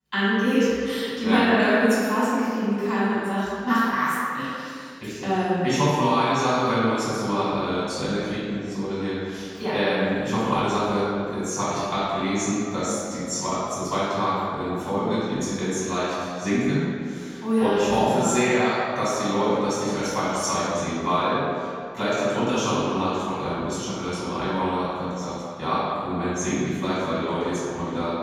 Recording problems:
room echo; strong; dies away in 2.1 s
off-mic speech; far

